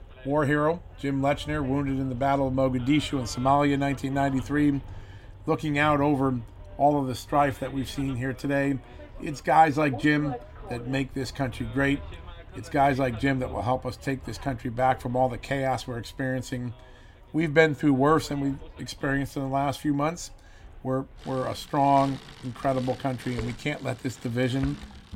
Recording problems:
traffic noise; noticeable; throughout; 20 dB below the speech

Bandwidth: 16 kHz